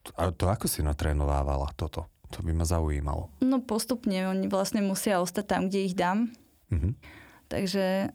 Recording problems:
none

